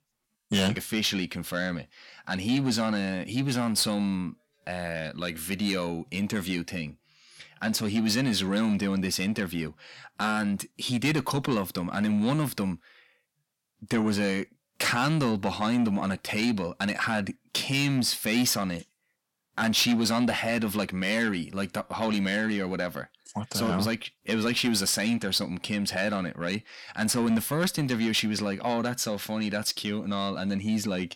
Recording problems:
distortion; slight; 10 dB below the speech

